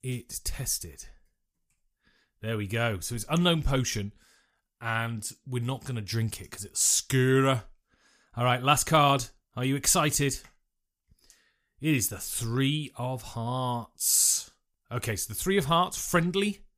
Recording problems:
none

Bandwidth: 15 kHz